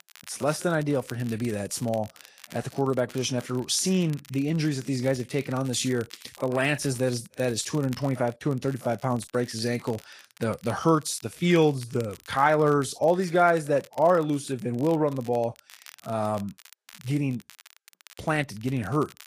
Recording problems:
garbled, watery; slightly; nothing above 12 kHz
crackle, like an old record; faint; 25 dB below the speech

